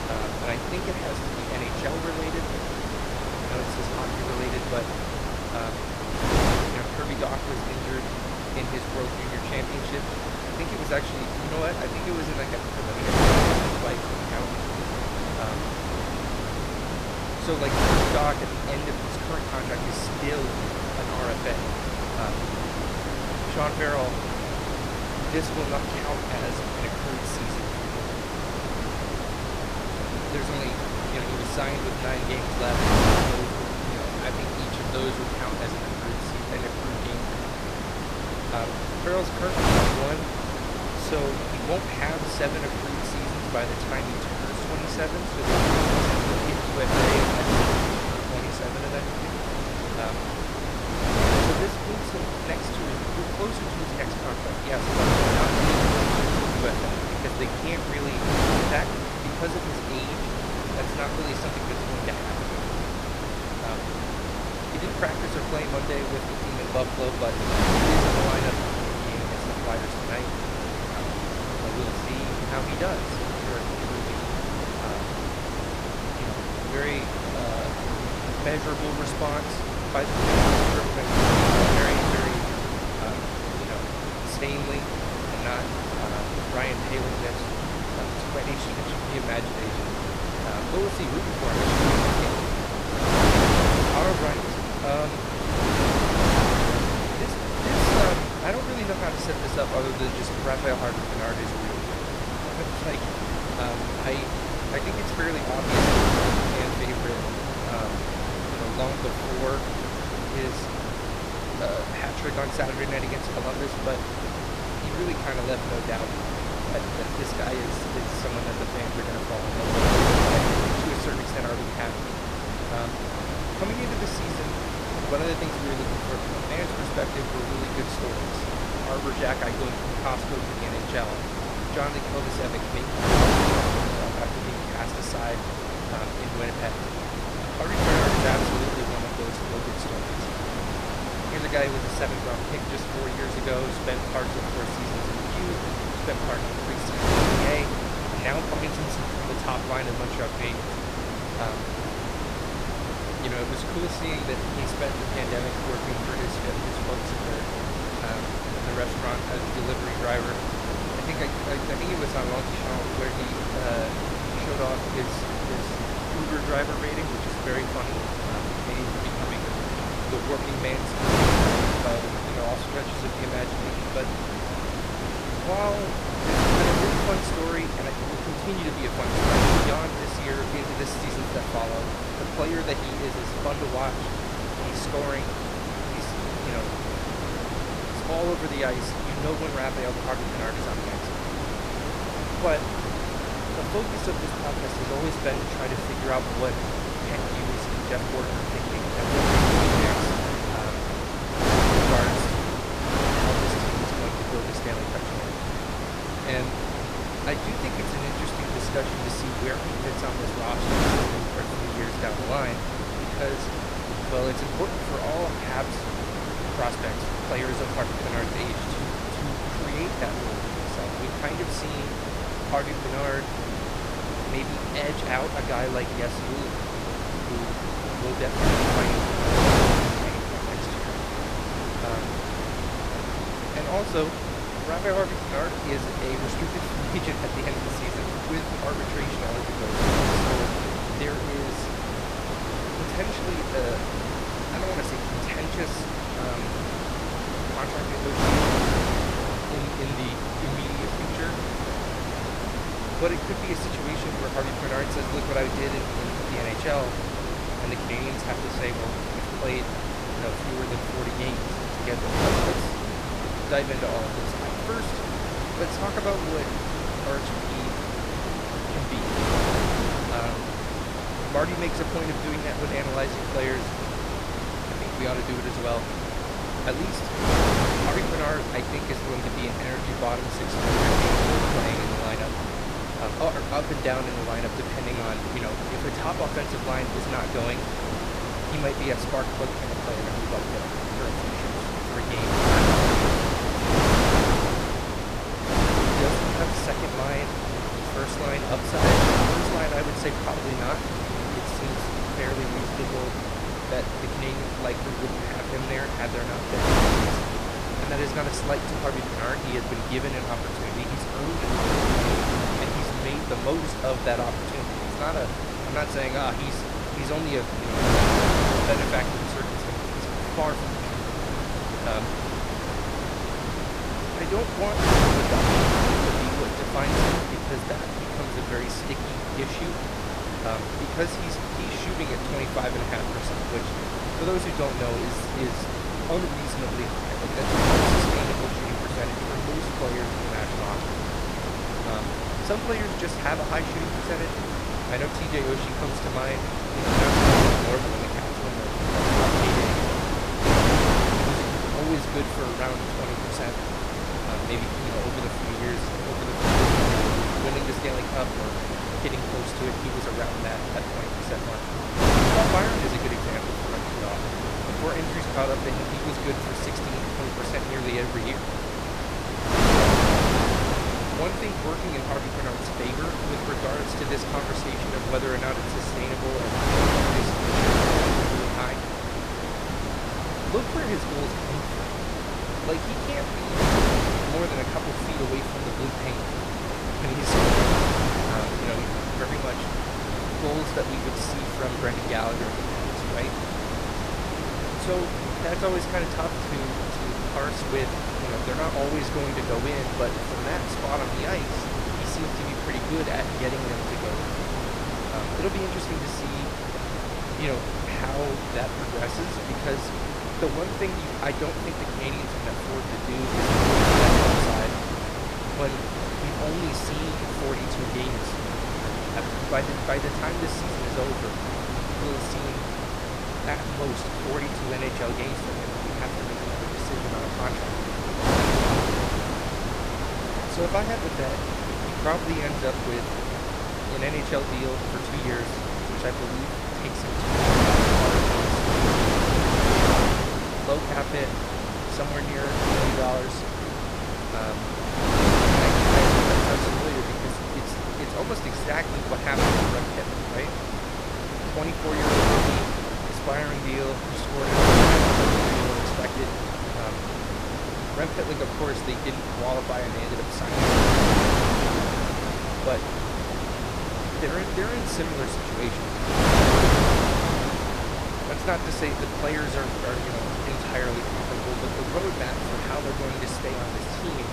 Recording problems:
wind noise on the microphone; heavy; 5 dB above the speech

